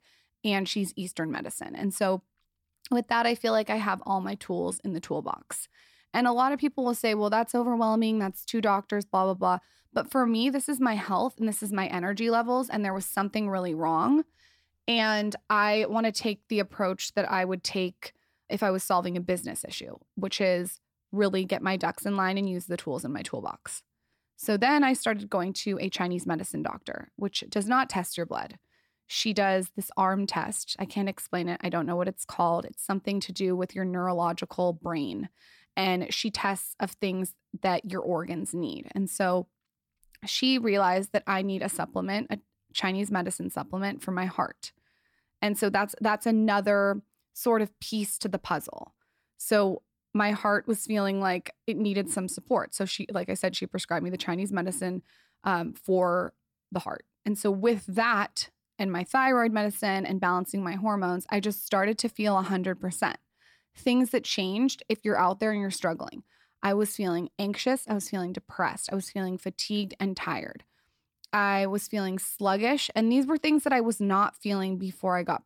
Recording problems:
none

